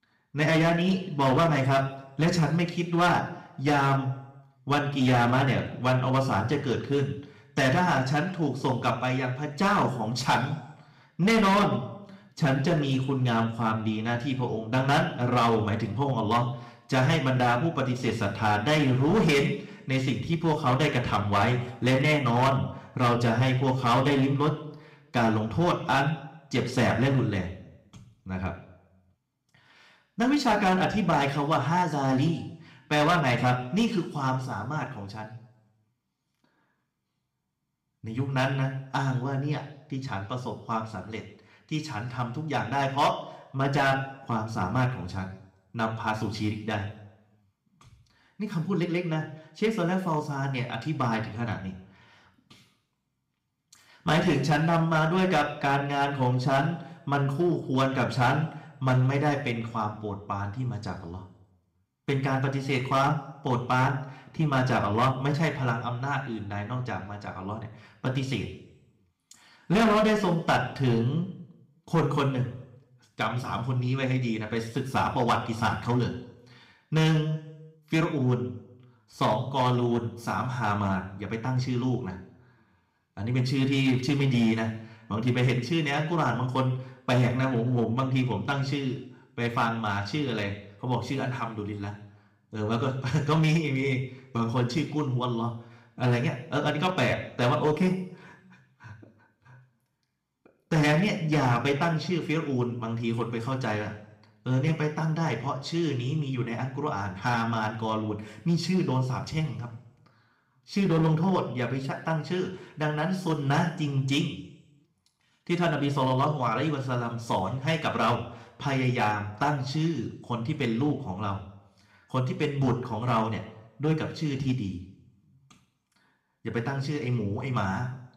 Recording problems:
room echo; slight; dies away in 0.7 s
distortion; slight; 4% of the sound clipped
off-mic speech; somewhat distant

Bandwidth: 15.5 kHz